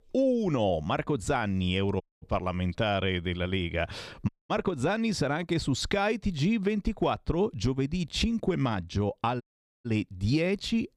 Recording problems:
audio cutting out; at 2 s, at 4.5 s and at 9.5 s

